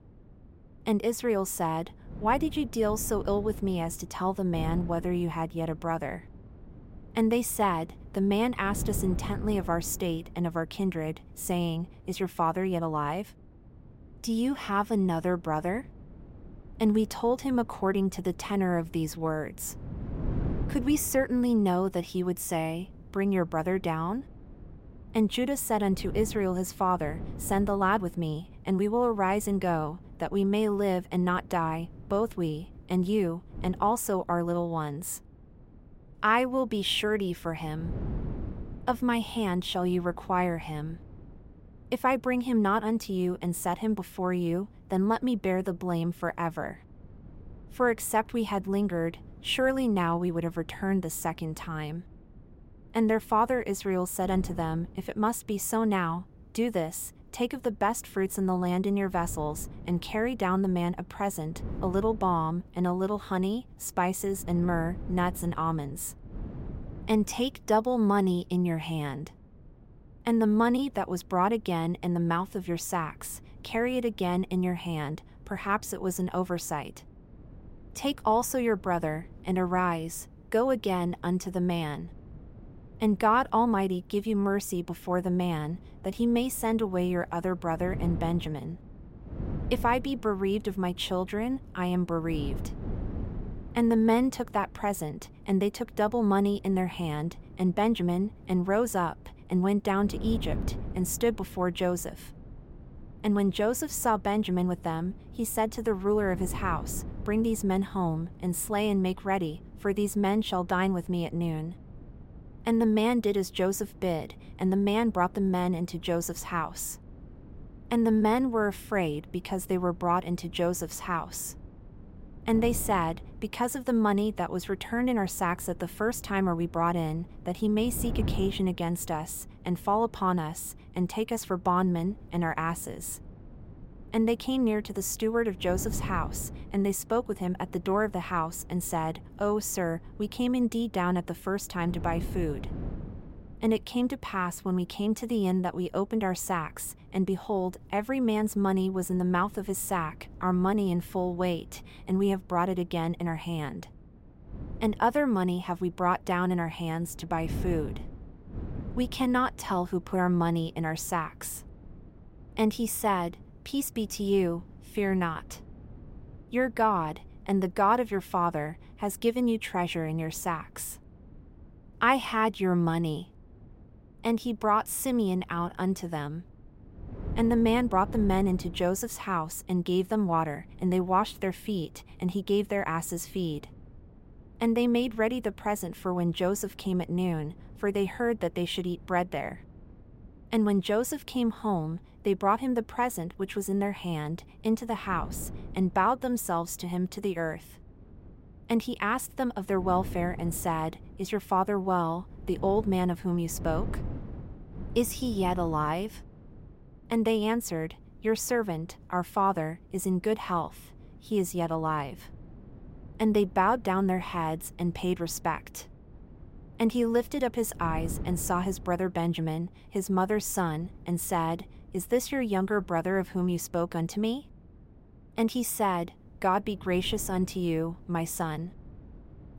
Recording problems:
wind noise on the microphone; occasional gusts; 25 dB below the speech

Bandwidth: 16 kHz